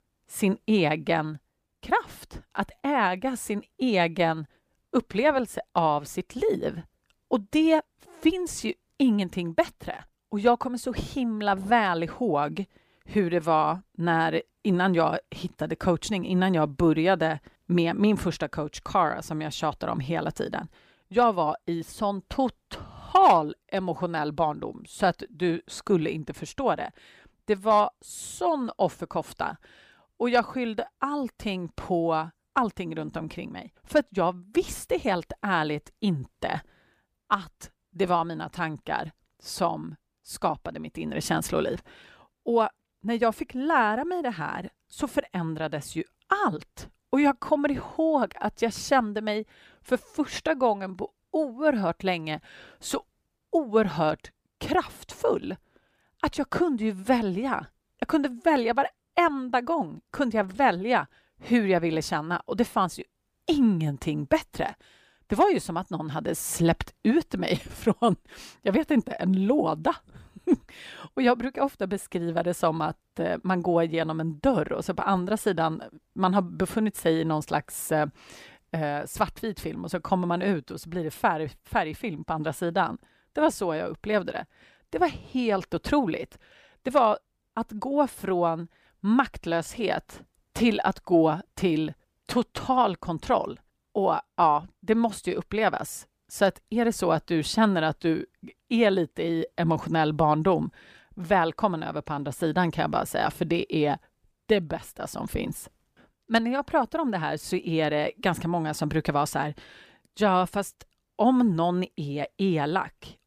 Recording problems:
none

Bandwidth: 15 kHz